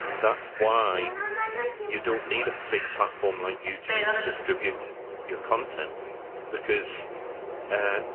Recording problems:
phone-call audio
garbled, watery; slightly
train or aircraft noise; loud; throughout; 4 dB below the speech

